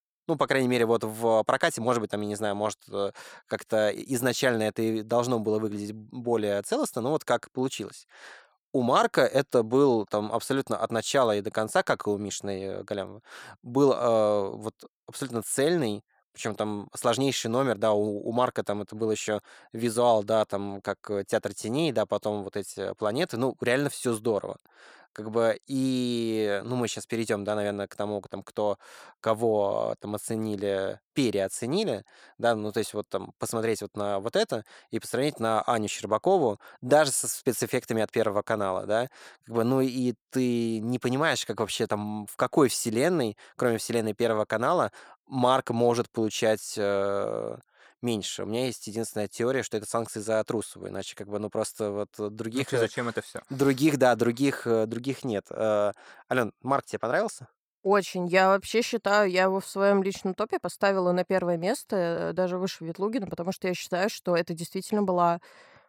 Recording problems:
none

